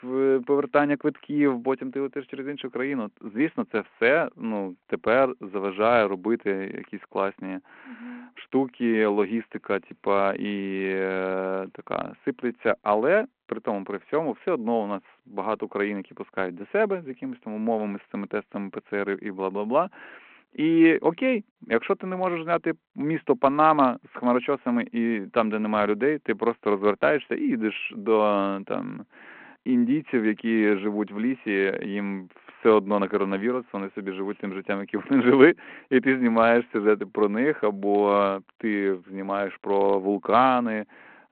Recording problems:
phone-call audio; nothing above 4 kHz

